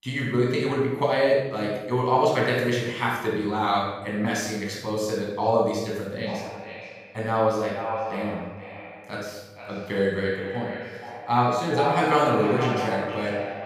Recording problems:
echo of what is said; strong; from 6 s on; 470 ms later, 7 dB below the speech
off-mic speech; far
room echo; noticeable; dies away in 0.9 s

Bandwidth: 15 kHz